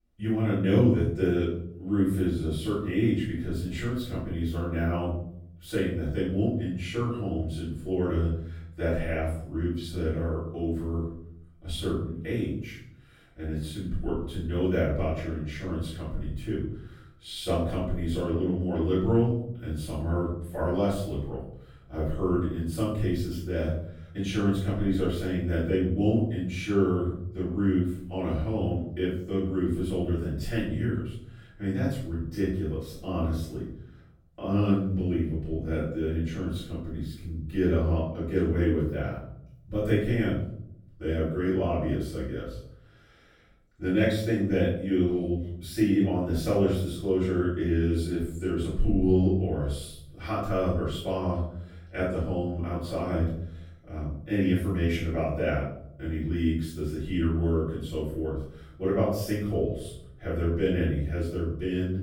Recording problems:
off-mic speech; far
room echo; noticeable; dies away in 0.7 s

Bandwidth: 17 kHz